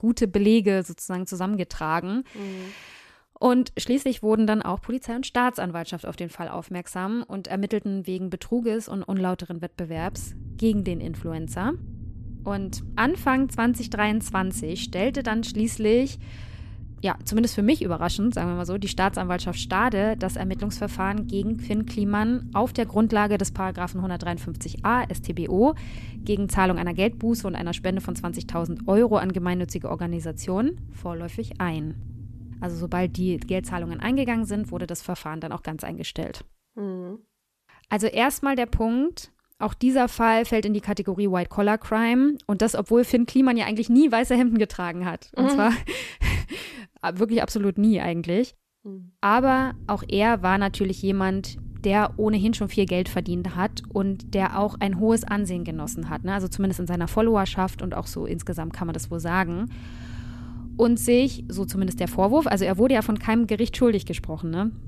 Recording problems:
low rumble; faint; from 10 to 35 s and from 49 s on; 20 dB below the speech

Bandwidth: 14 kHz